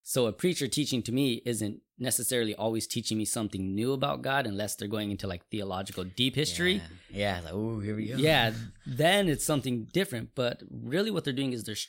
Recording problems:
none

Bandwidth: 16 kHz